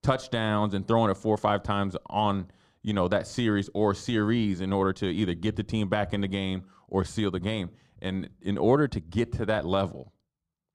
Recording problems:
muffled; slightly; fading above 1.5 kHz

